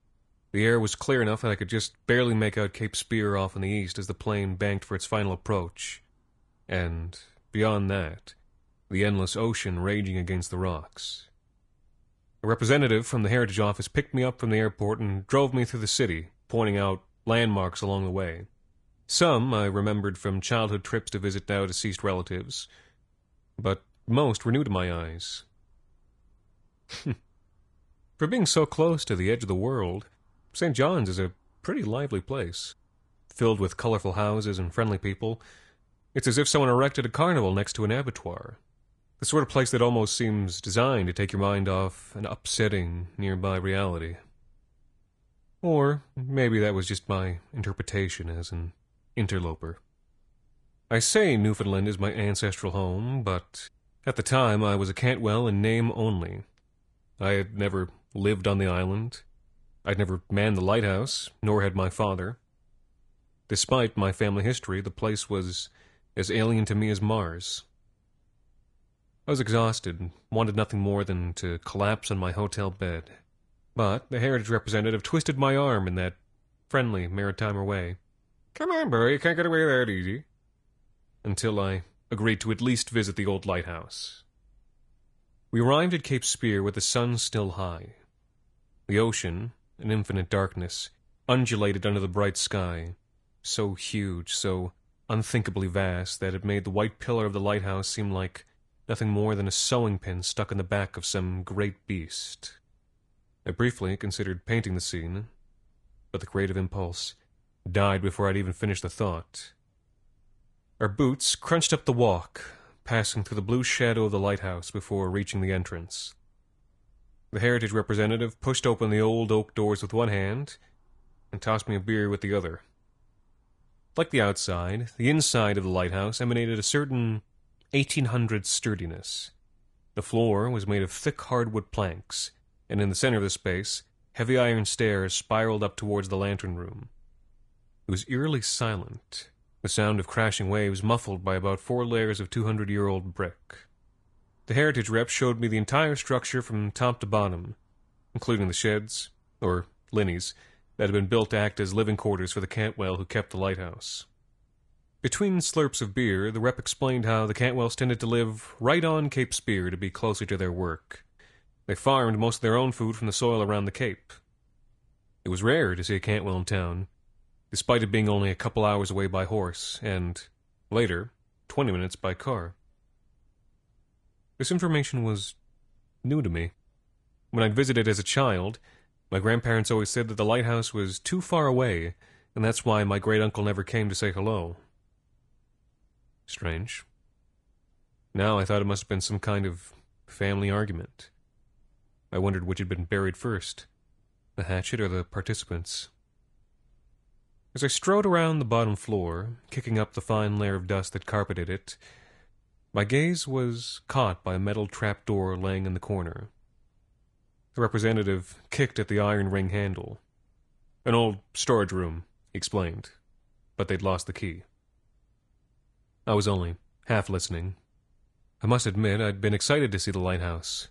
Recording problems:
garbled, watery; slightly; nothing above 10.5 kHz

